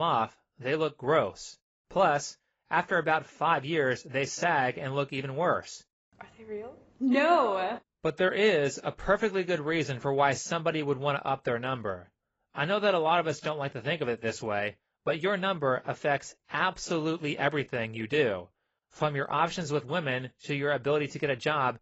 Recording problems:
garbled, watery; badly; nothing above 7.5 kHz
abrupt cut into speech; at the start

